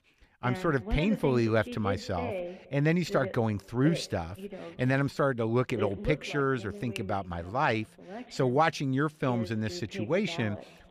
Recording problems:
voice in the background; noticeable; throughout; 10 dB below the speech

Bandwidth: 14.5 kHz